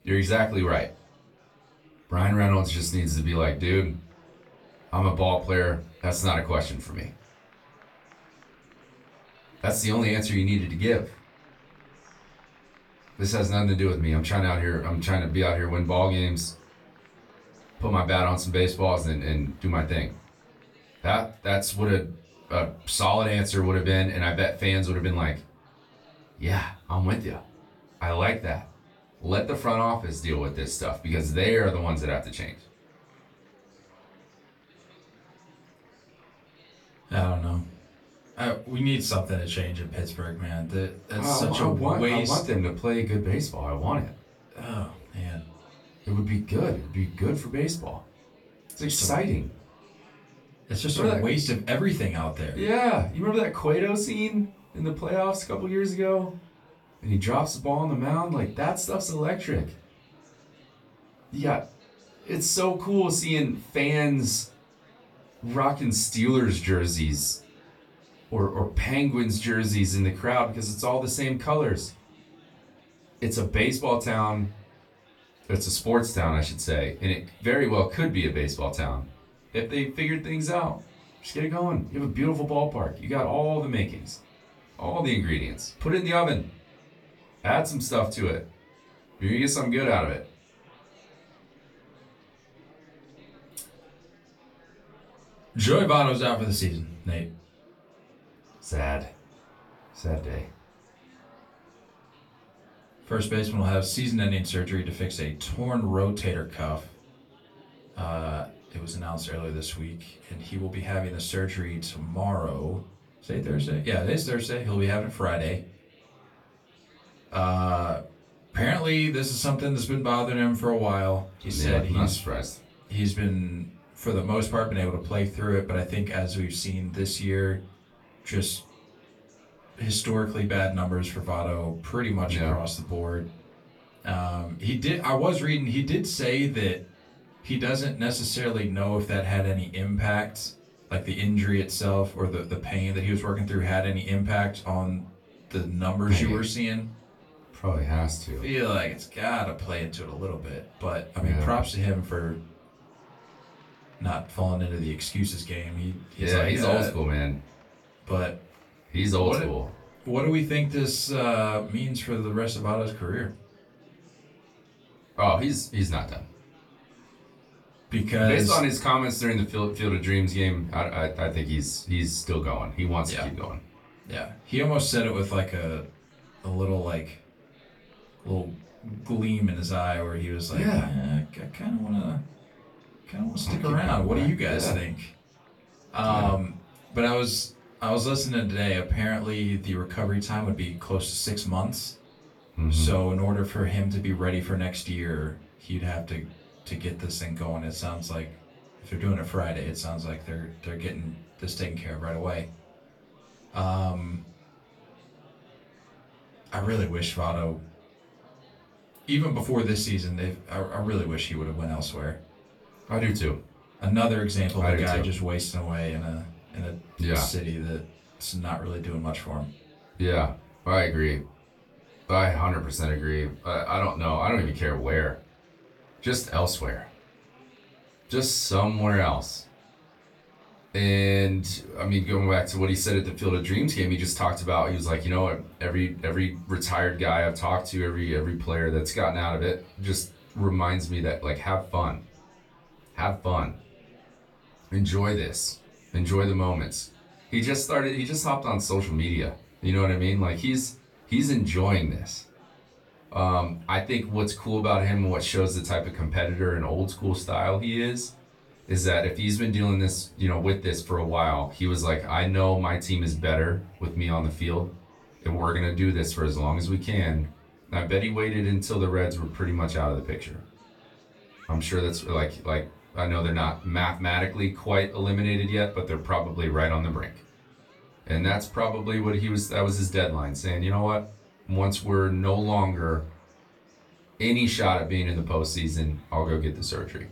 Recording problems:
off-mic speech; far
room echo; very slight; dies away in 0.2 s
murmuring crowd; faint; throughout; 30 dB below the speech

